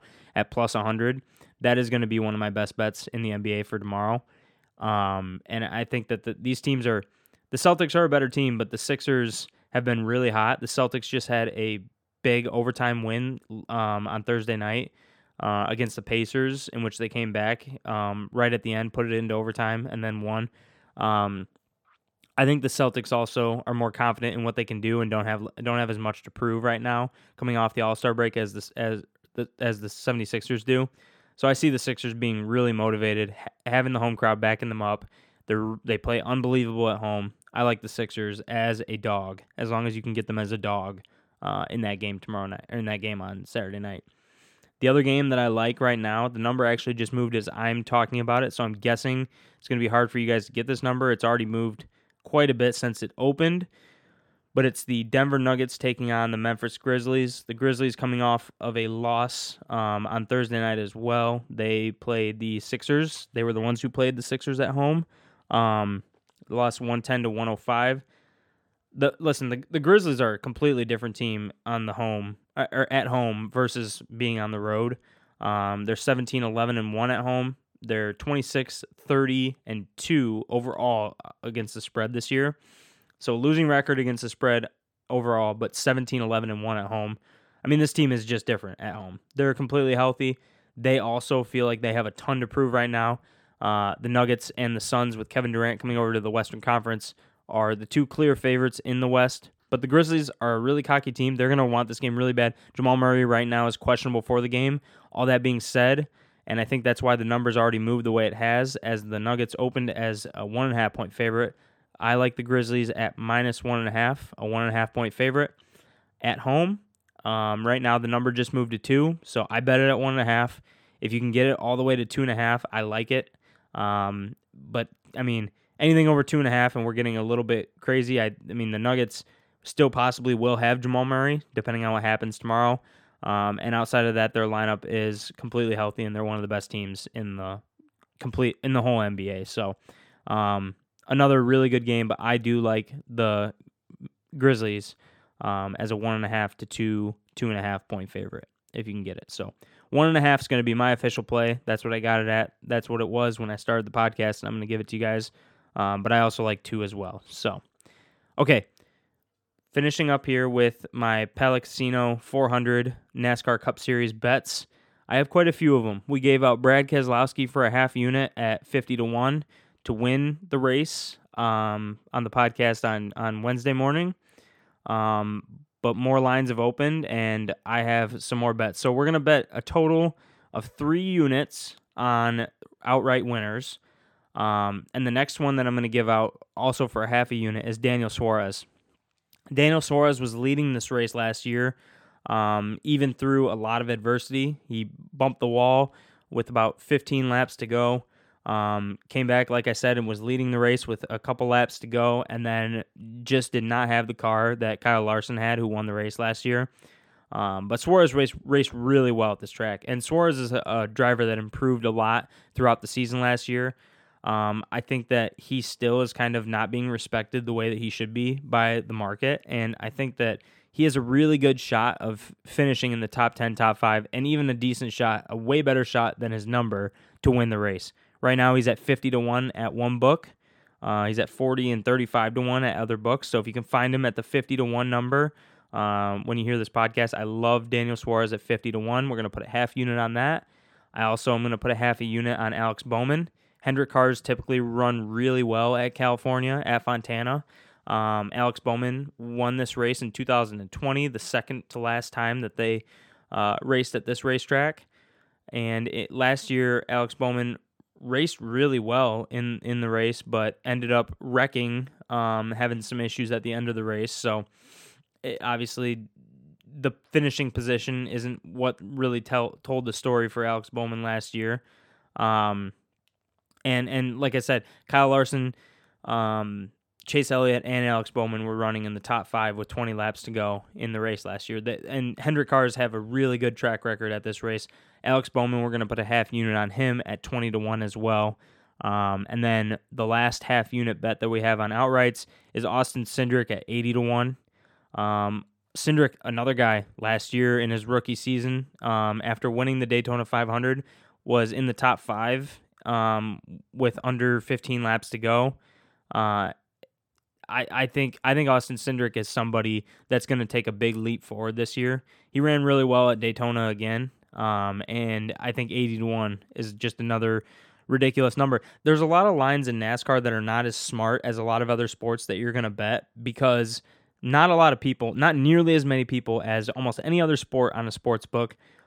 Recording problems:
none

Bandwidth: 18 kHz